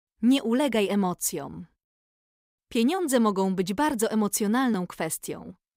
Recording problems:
none

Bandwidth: 15.5 kHz